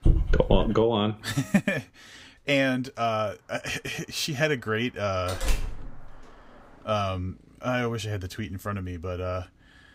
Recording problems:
traffic noise; faint; from 3 s on; 30 dB below the speech
dog barking; loud; at the start; peak 3 dB above the speech
door banging; noticeable; at 5.5 s; peak 3 dB below the speech

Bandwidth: 15.5 kHz